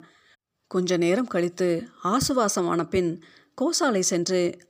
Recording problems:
none

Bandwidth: 15 kHz